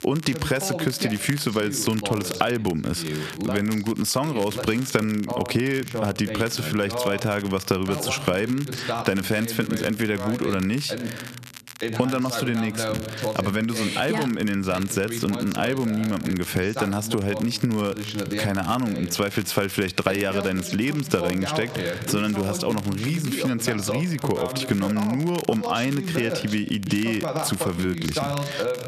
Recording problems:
squashed, flat; somewhat, background pumping
voice in the background; loud; throughout; 7 dB below the speech
crackle, like an old record; noticeable; 15 dB below the speech

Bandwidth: 14 kHz